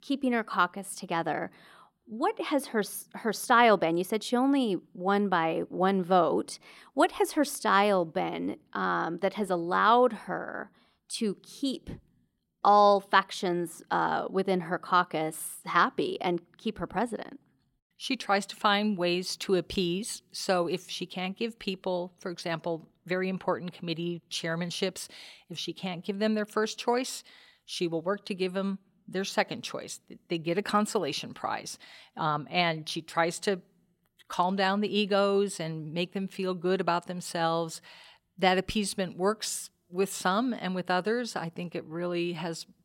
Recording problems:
none

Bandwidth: 16.5 kHz